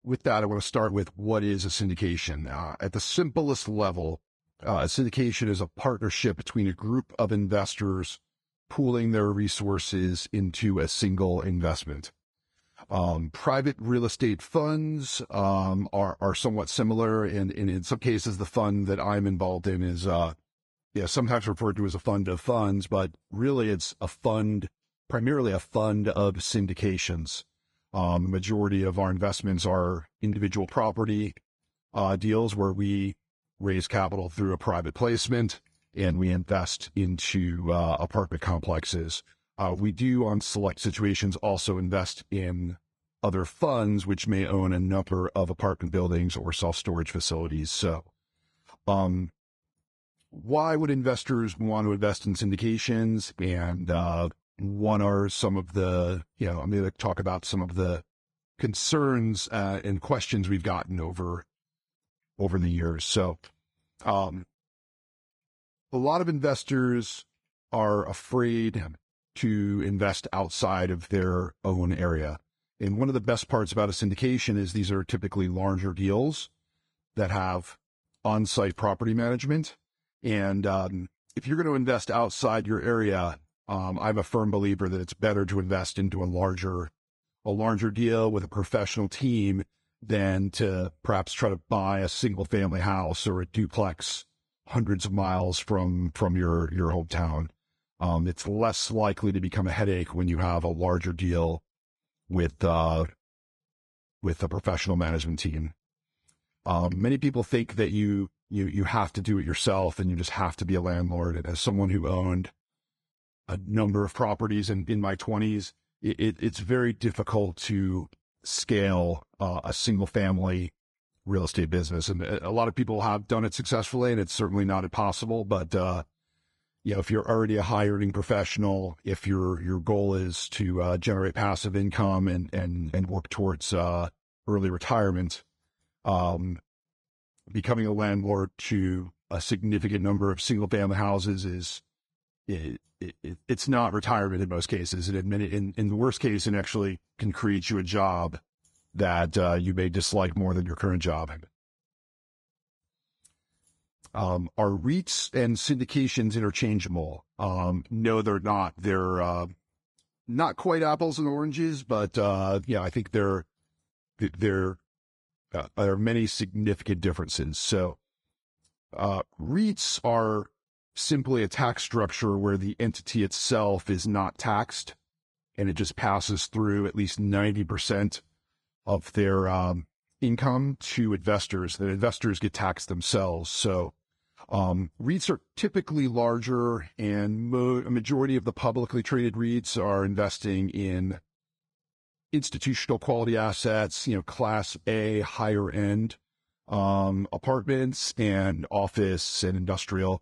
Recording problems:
garbled, watery; slightly

